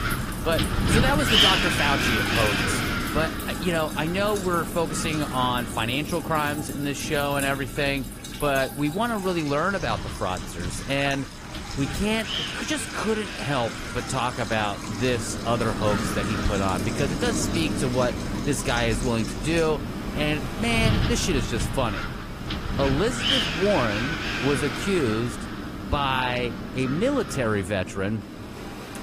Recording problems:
garbled, watery; slightly; nothing above 15 kHz
wind noise on the microphone; heavy; 2 dB below the speech
rain or running water; noticeable; throughout; 10 dB below the speech

